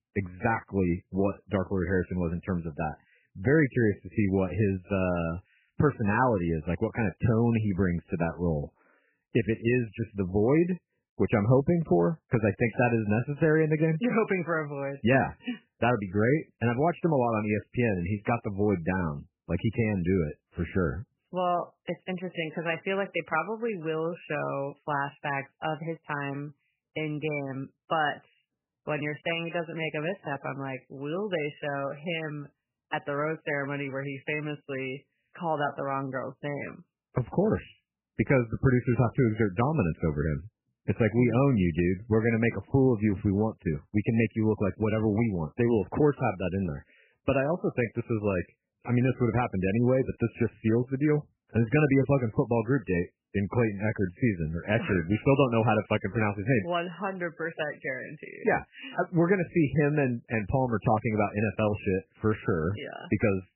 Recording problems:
garbled, watery; badly; nothing above 3 kHz

